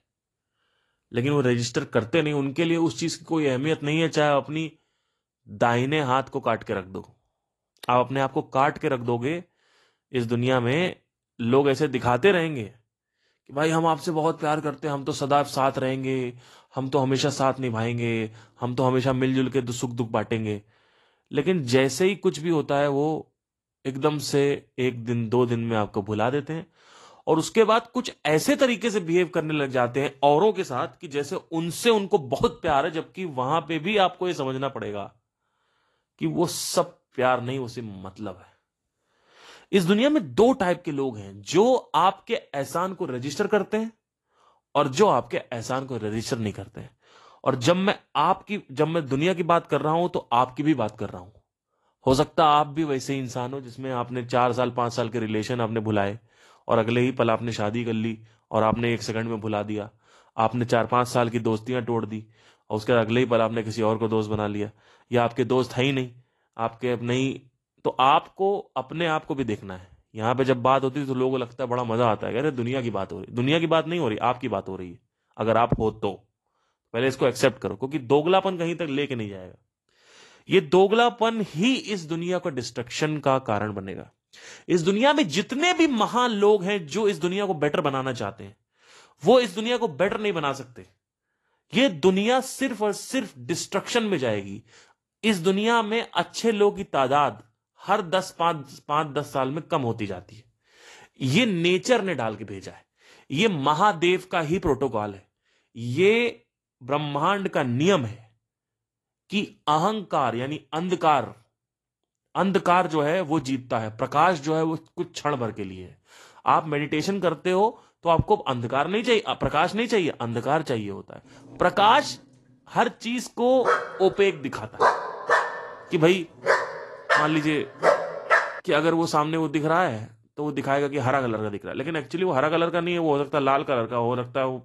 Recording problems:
garbled, watery; slightly; nothing above 12.5 kHz
dog barking; loud; from 2:04 to 2:08; peak 3 dB above the speech

